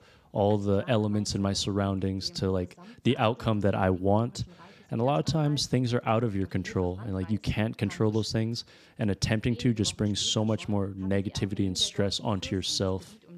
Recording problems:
voice in the background; faint; throughout; 25 dB below the speech

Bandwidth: 14.5 kHz